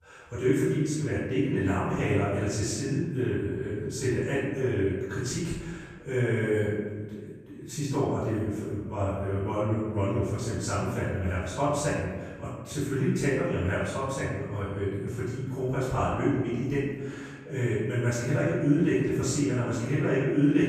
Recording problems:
room echo; strong; dies away in 1.3 s
off-mic speech; far

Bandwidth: 14.5 kHz